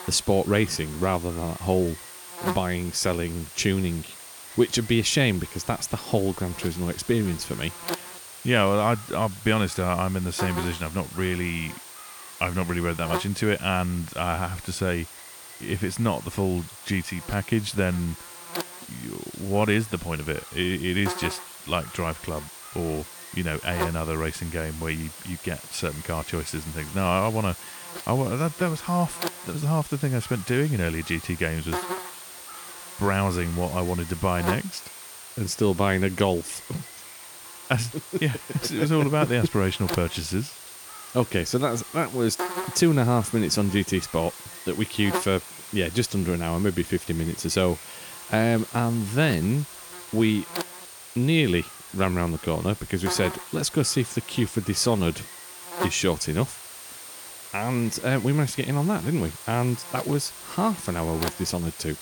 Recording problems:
electrical hum; noticeable; throughout; 60 Hz, 10 dB below the speech

